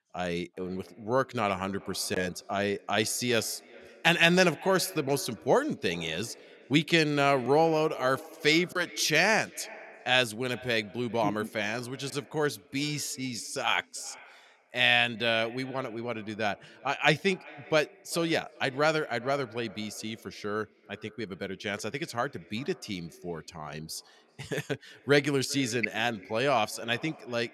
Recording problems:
echo of what is said; faint; throughout; 390 ms later, 20 dB below the speech

